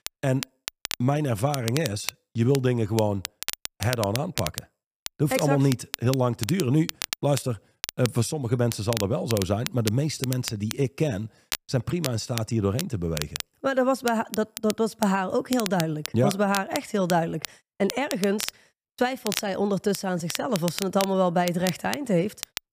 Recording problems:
crackle, like an old record; loud; 9 dB below the speech

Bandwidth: 15 kHz